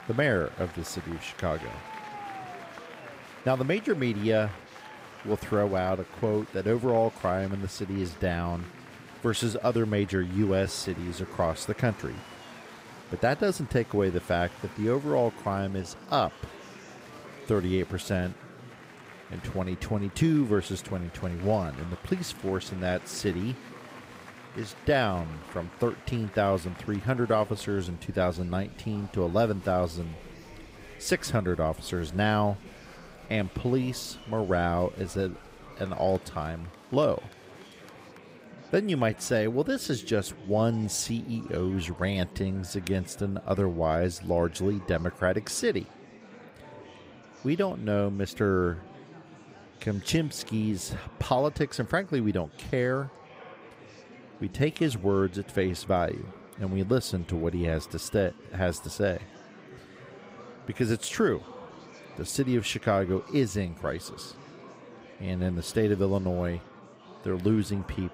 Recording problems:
murmuring crowd; noticeable; throughout; 20 dB below the speech

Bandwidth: 15.5 kHz